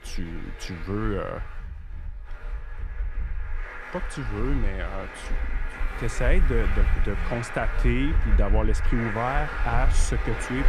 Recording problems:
traffic noise; very loud; throughout; as loud as the speech

